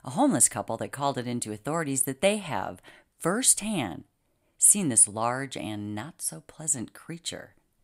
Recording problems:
none

